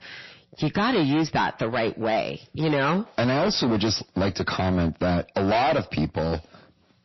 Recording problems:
distortion; heavy; 17% of the sound clipped
garbled, watery; slightly; nothing above 5.5 kHz

